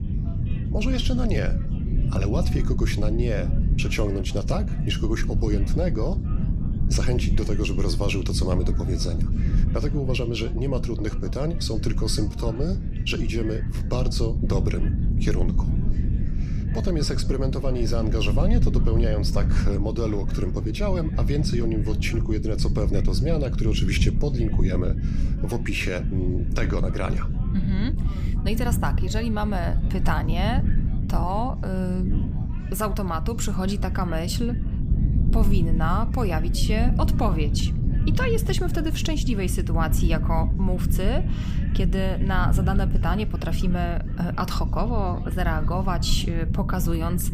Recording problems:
low rumble; loud; throughout; 8 dB below the speech
chatter from many people; faint; throughout; 20 dB below the speech

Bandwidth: 15 kHz